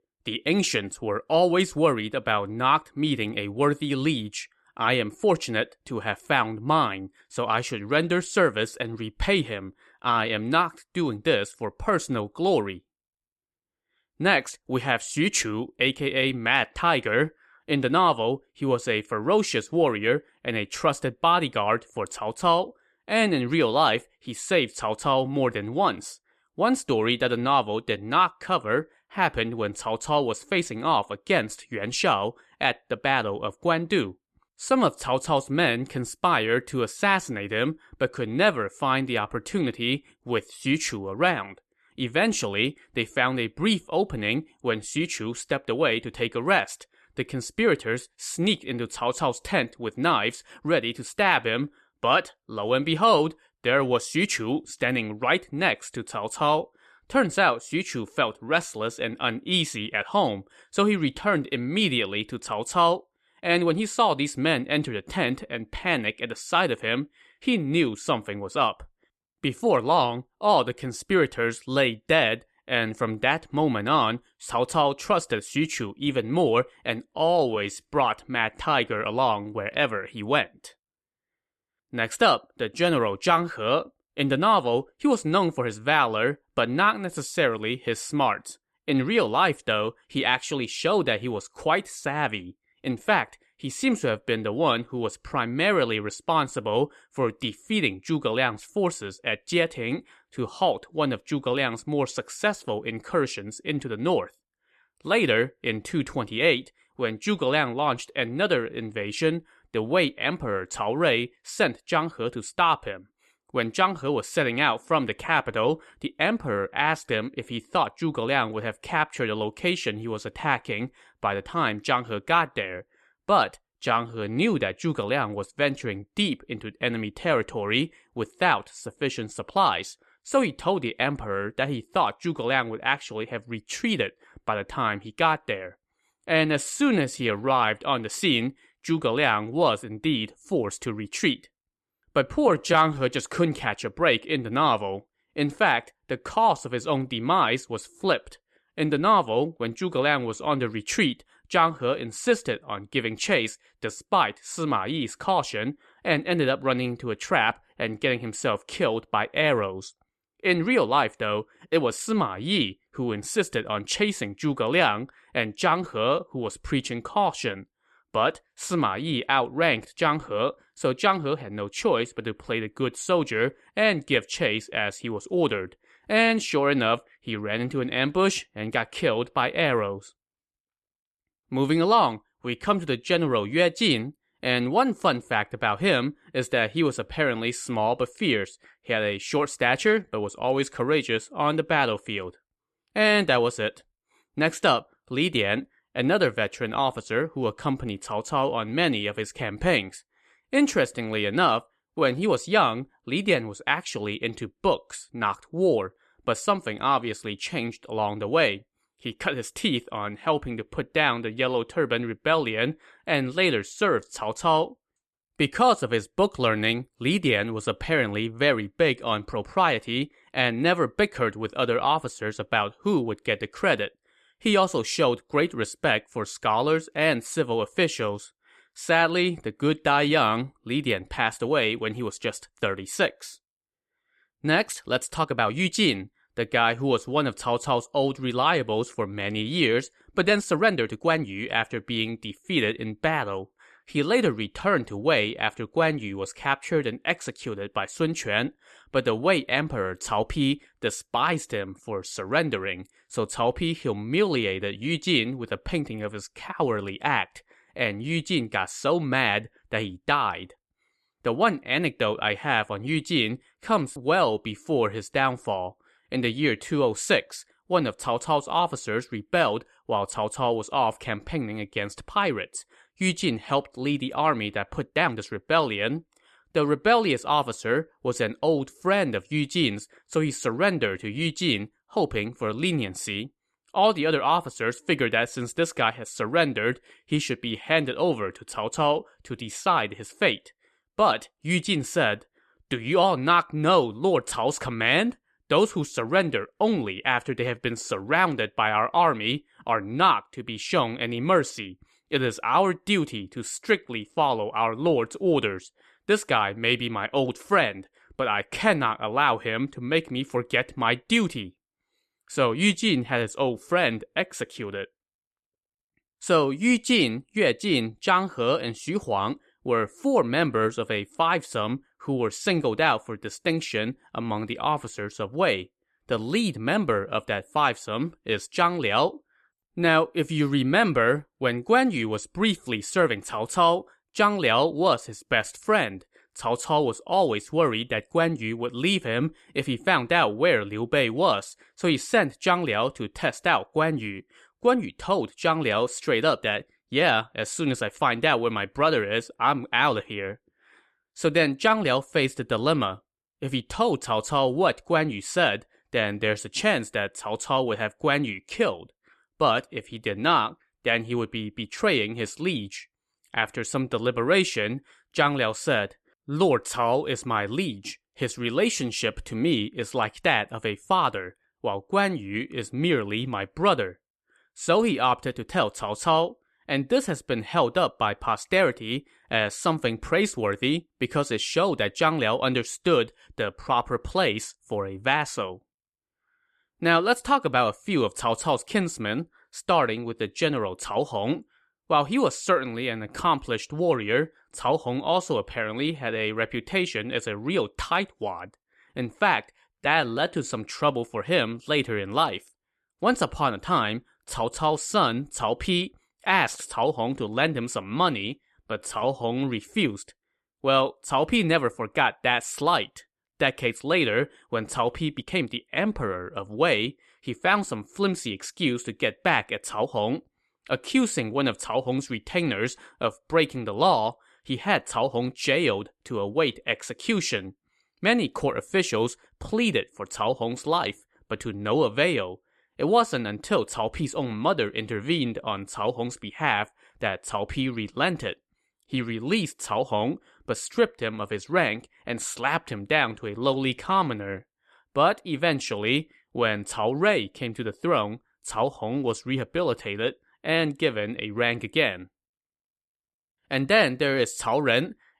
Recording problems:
uneven, jittery; strongly; from 1:03 to 6:55

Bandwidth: 13.5 kHz